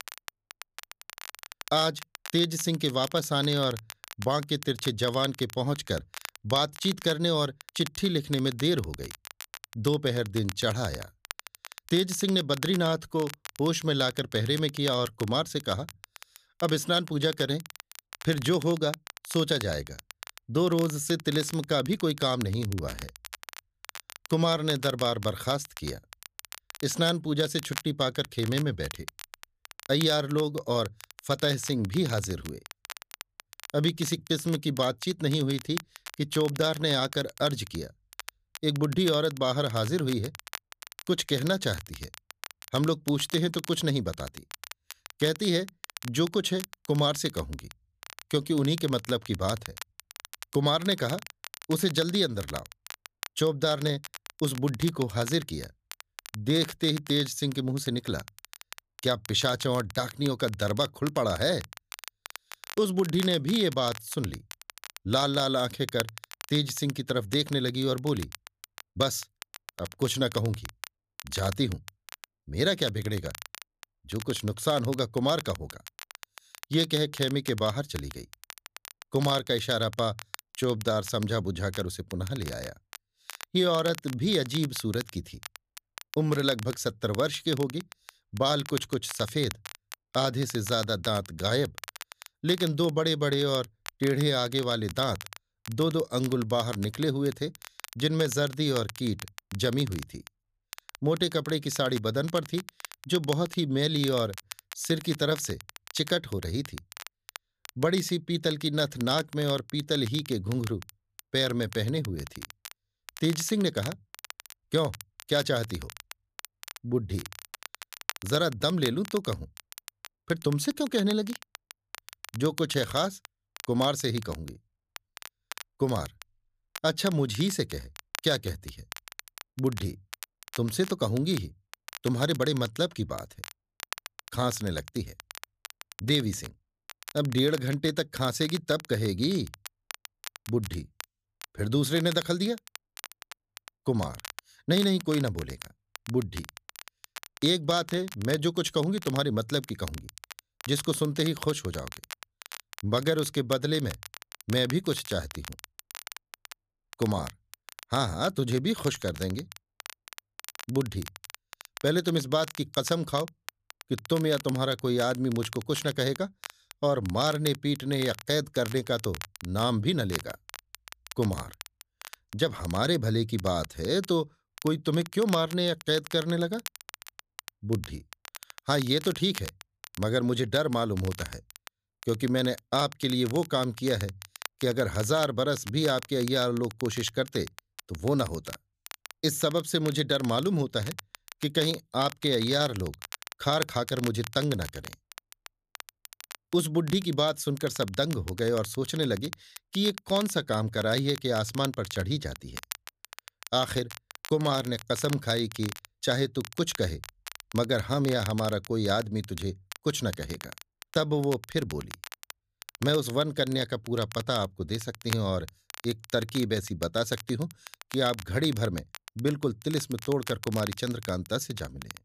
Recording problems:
crackle, like an old record; noticeable; 15 dB below the speech

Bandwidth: 14.5 kHz